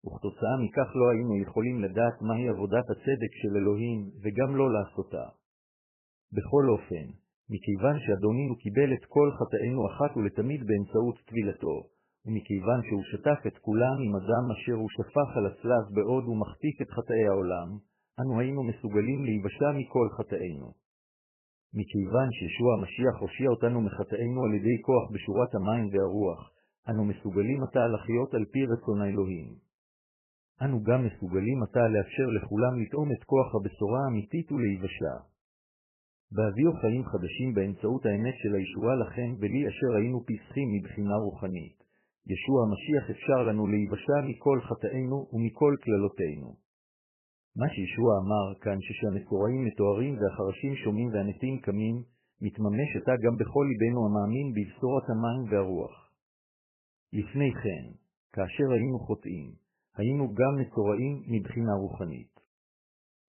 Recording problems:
garbled, watery; badly; nothing above 3 kHz

